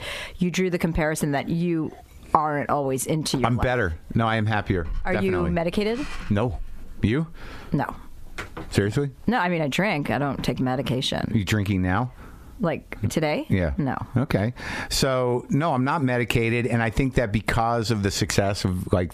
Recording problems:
squashed, flat; heavily

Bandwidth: 14.5 kHz